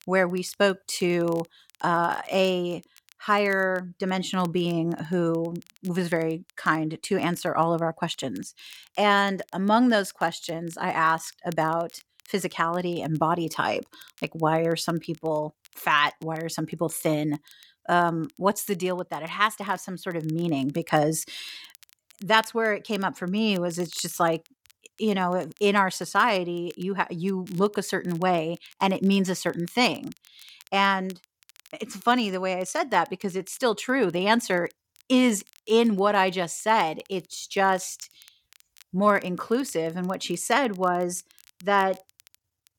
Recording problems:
crackle, like an old record; faint; 30 dB below the speech

